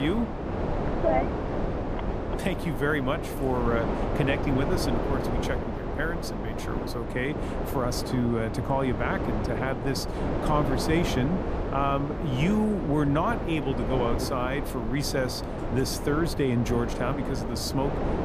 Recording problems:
wind noise on the microphone; heavy; 3 dB below the speech
abrupt cut into speech; at the start

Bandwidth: 14.5 kHz